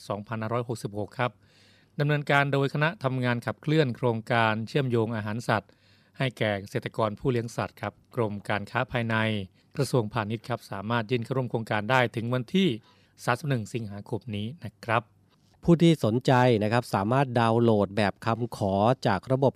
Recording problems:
none

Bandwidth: 14.5 kHz